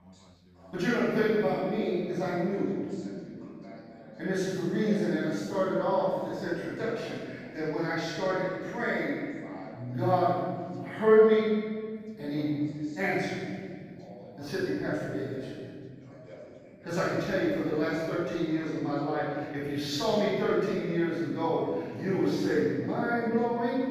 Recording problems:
room echo; strong; dies away in 2 s
off-mic speech; far
background chatter; faint; throughout; 2 voices, 20 dB below the speech

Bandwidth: 15 kHz